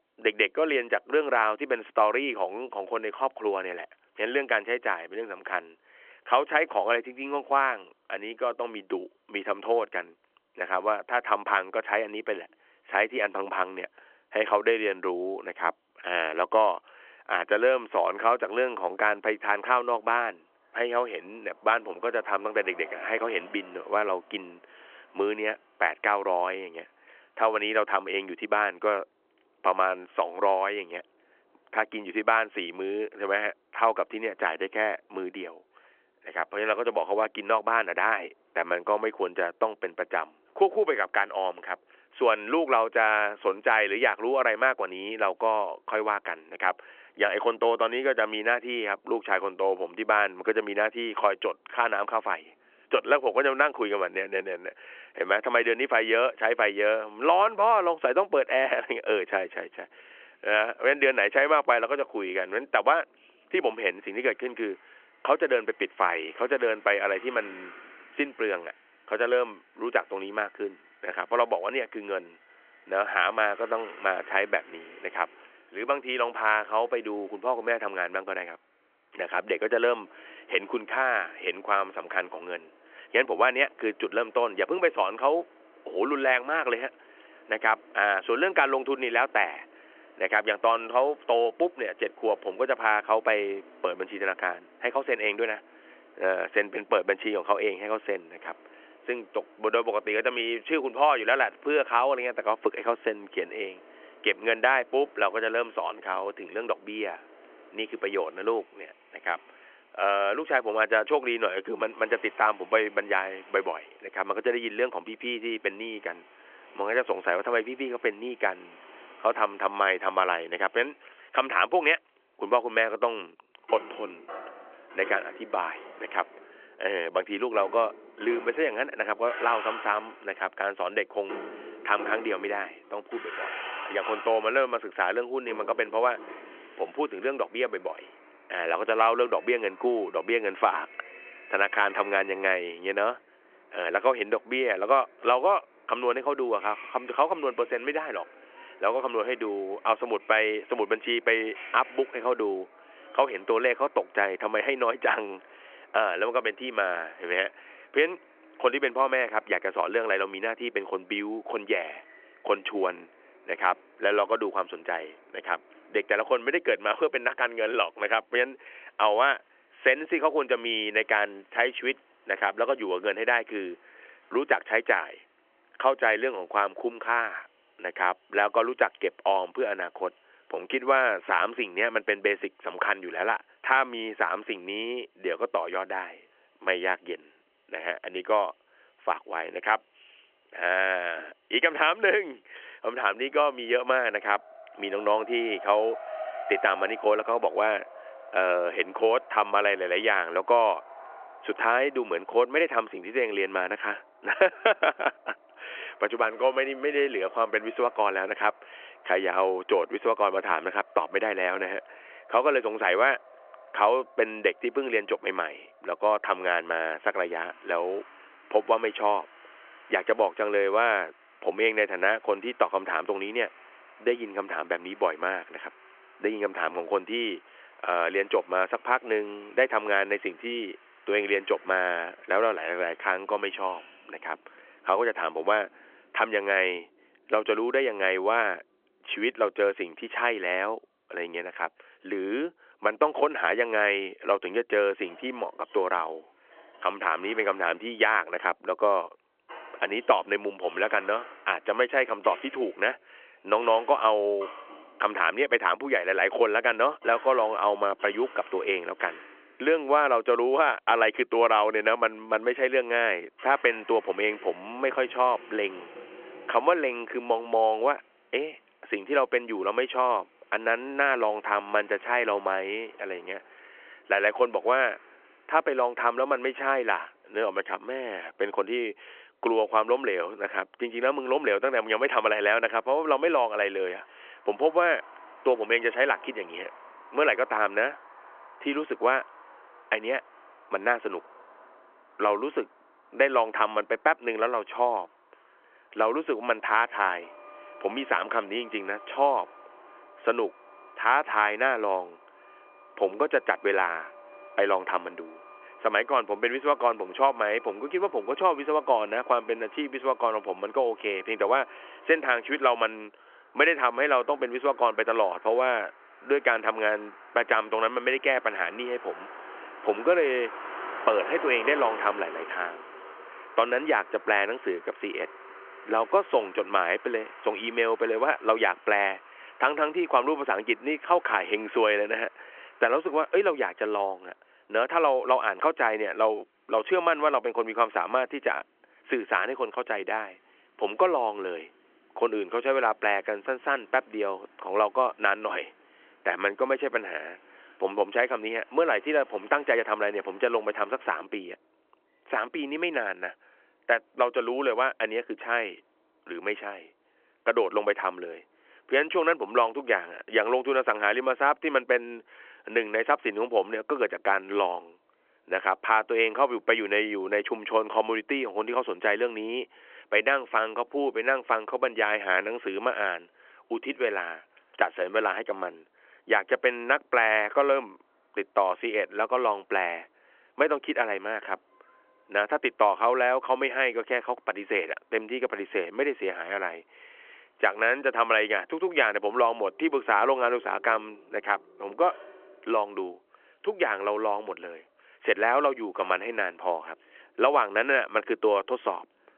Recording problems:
phone-call audio; nothing above 3 kHz
traffic noise; faint; throughout; 20 dB below the speech

